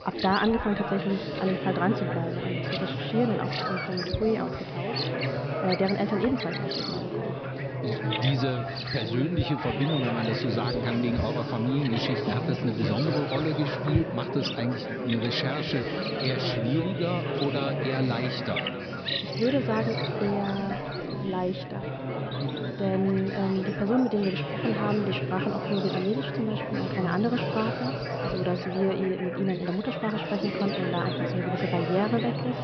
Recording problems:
echo of what is said; noticeable; throughout; 270 ms later, 15 dB below the speech
high frequencies cut off; noticeable; nothing above 5.5 kHz
animal sounds; loud; throughout; 8 dB below the speech
chatter from many people; loud; throughout; 2 dB below the speech

